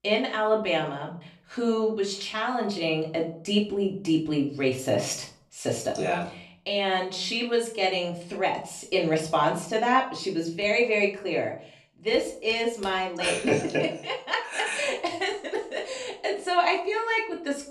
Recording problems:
off-mic speech; far
room echo; slight; dies away in 0.4 s

